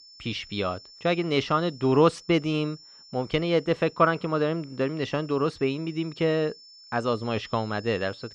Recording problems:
muffled; very slightly; fading above 4.5 kHz
high-pitched whine; faint; throughout; 5.5 kHz, 20 dB below the speech

